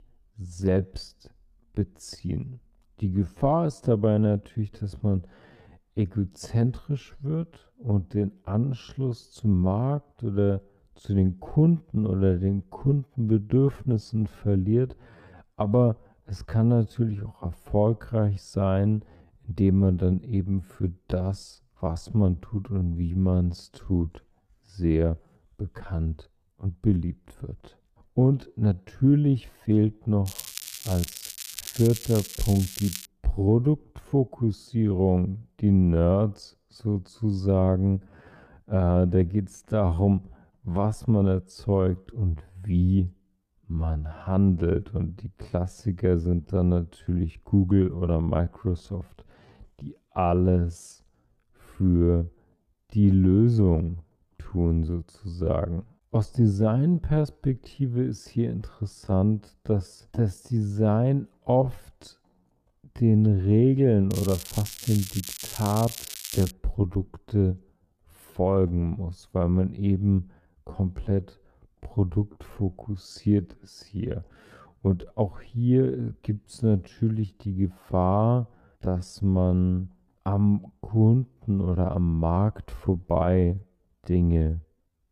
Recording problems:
wrong speed, natural pitch; too slow; 0.6 times normal speed
muffled; slightly; fading above 1 kHz
crackling; noticeable; from 30 to 33 s and from 1:04 to 1:07; 10 dB below the speech

